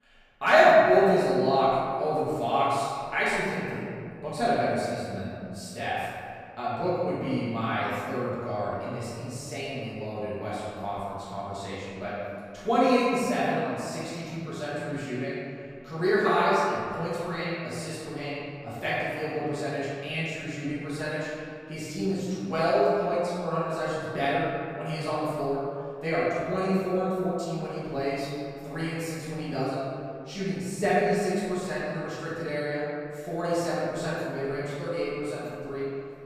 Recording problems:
room echo; strong; dies away in 2.2 s
off-mic speech; far

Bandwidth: 15 kHz